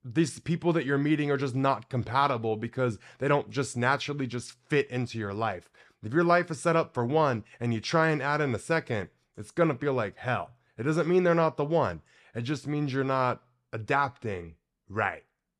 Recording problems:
none

